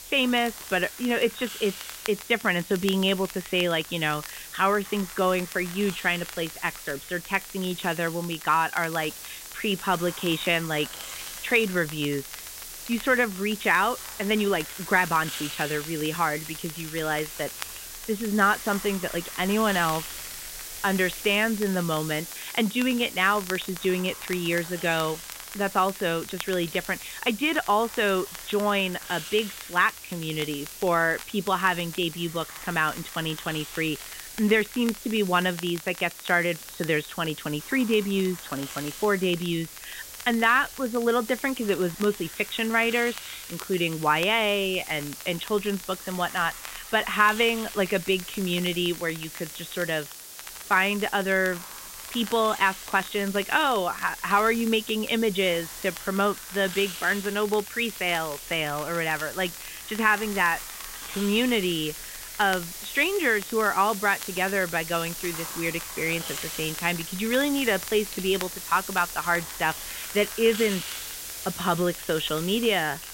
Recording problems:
high frequencies cut off; severe; nothing above 4 kHz
hiss; noticeable; throughout; 10 dB below the speech
crackle, like an old record; noticeable; 20 dB below the speech

